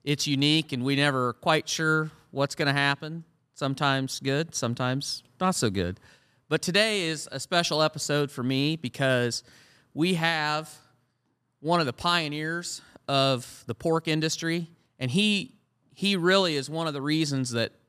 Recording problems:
none

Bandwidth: 14.5 kHz